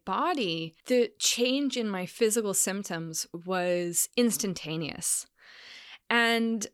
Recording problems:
none

